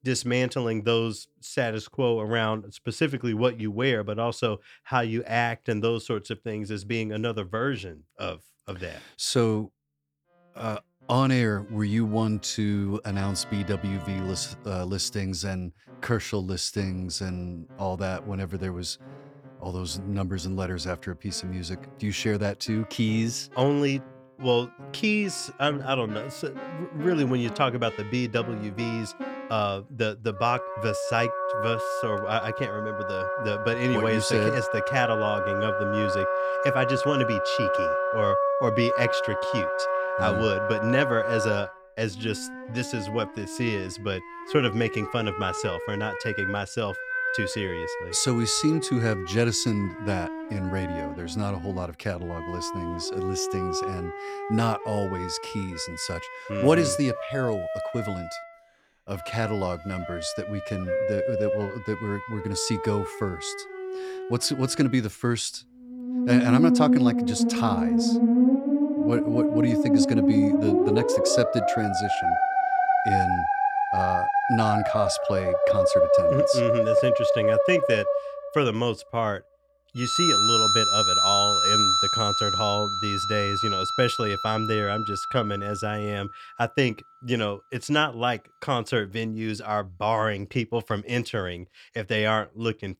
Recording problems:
background music; very loud; throughout; 2 dB above the speech

